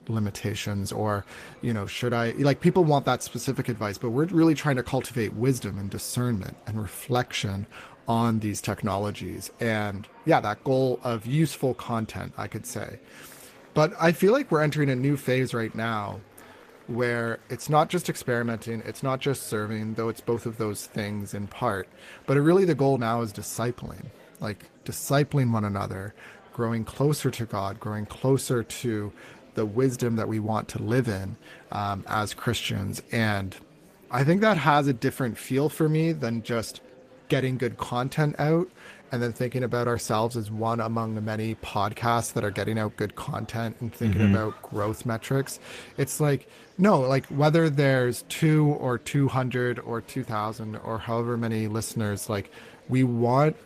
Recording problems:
garbled, watery; slightly; nothing above 14.5 kHz
murmuring crowd; faint; throughout; 25 dB below the speech

